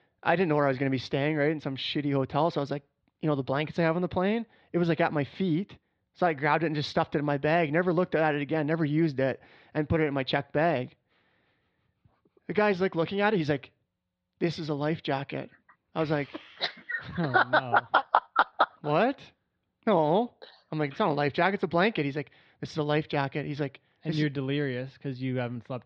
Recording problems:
muffled; slightly; fading above 4 kHz

